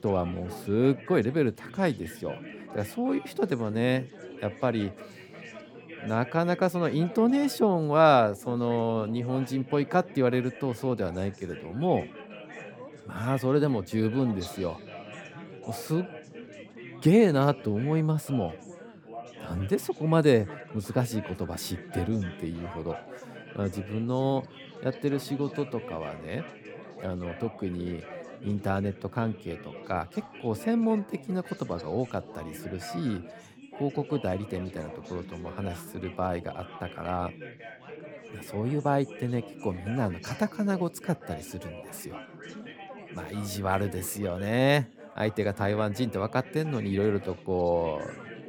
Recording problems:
chatter from many people; noticeable; throughout; 15 dB below the speech

